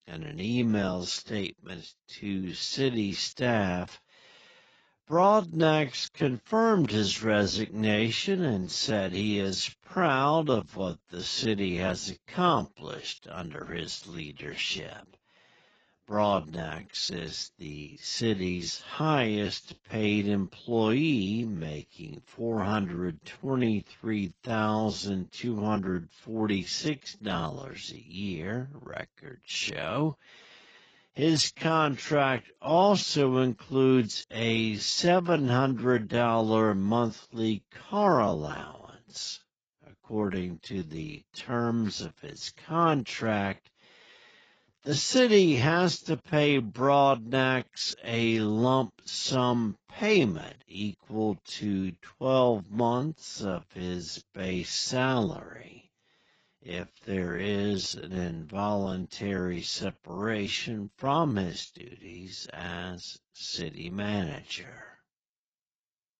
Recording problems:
garbled, watery; badly; nothing above 7.5 kHz
wrong speed, natural pitch; too slow; 0.5 times normal speed

